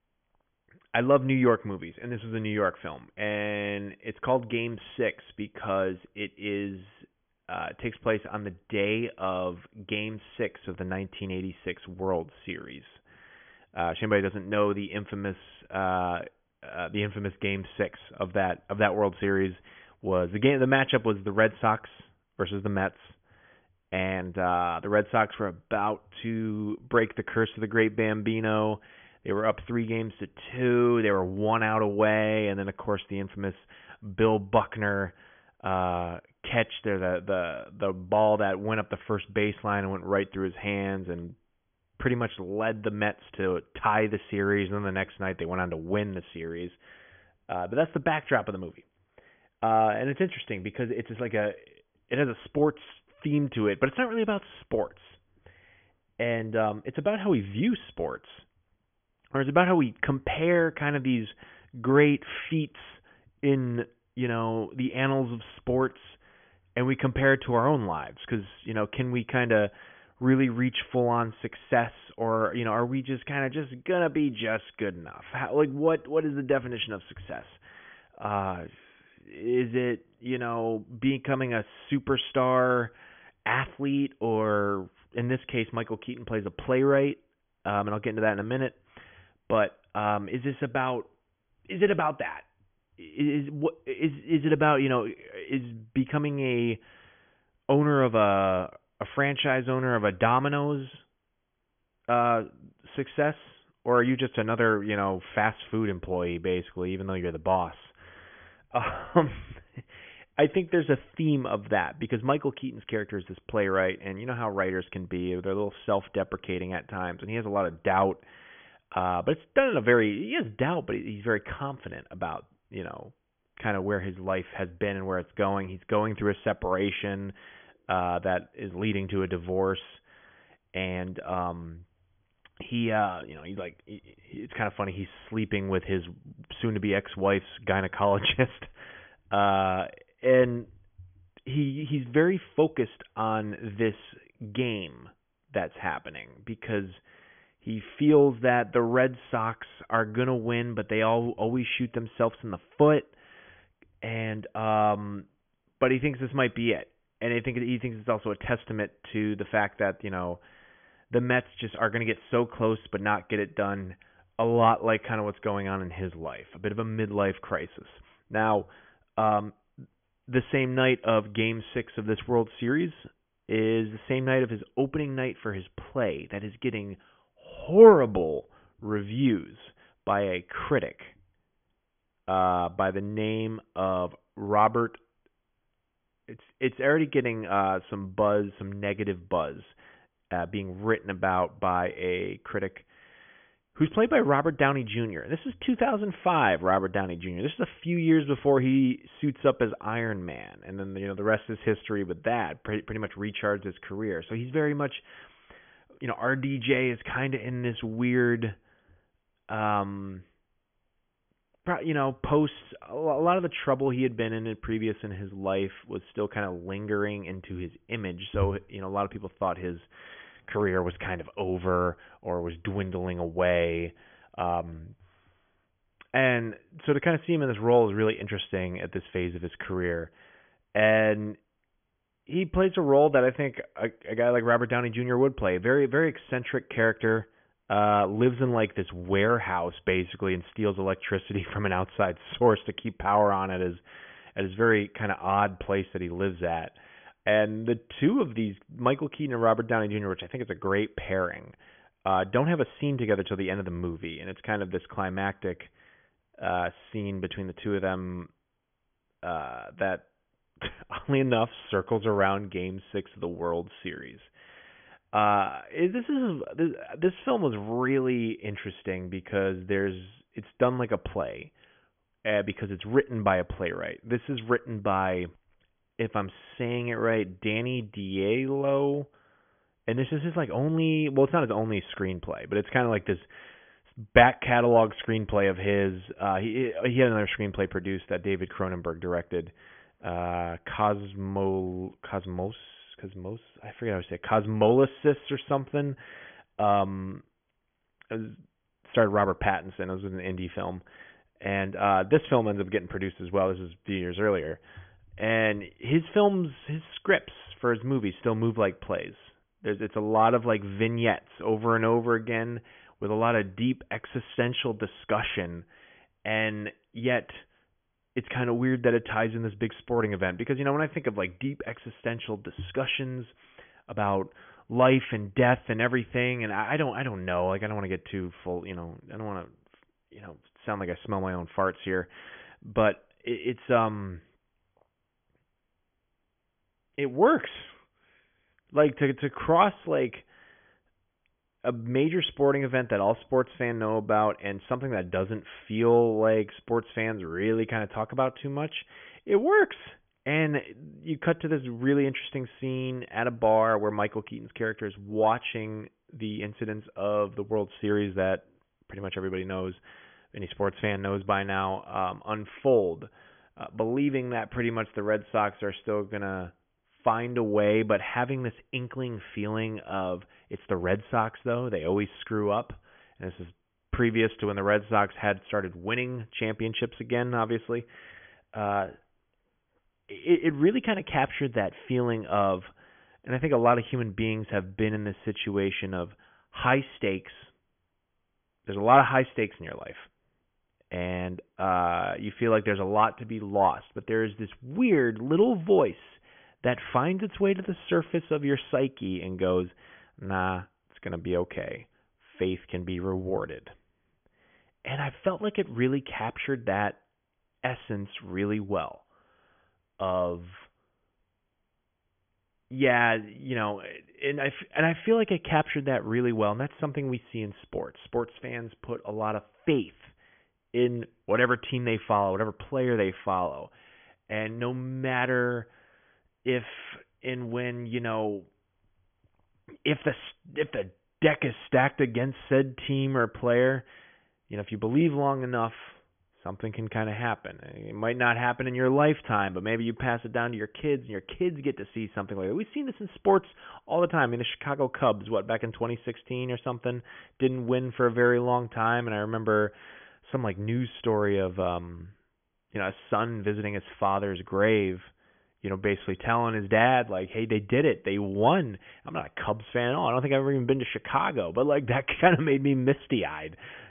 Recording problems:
high frequencies cut off; severe; nothing above 3.5 kHz

